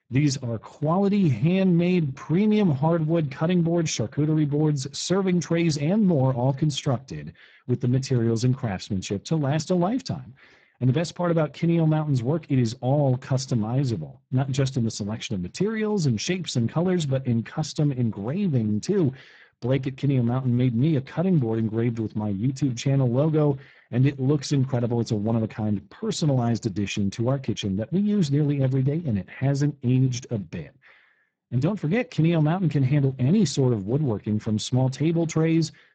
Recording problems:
garbled, watery; badly; nothing above 7.5 kHz

